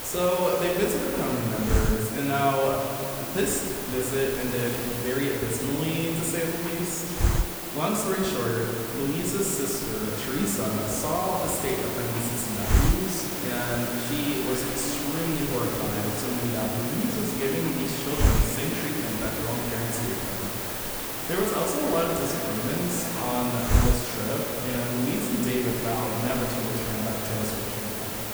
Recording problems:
echo of what is said; noticeable; from 14 s on; 480 ms later, 15 dB below the speech
room echo; noticeable; dies away in 2.3 s
off-mic speech; somewhat distant
hiss; loud; throughout; 2 dB below the speech

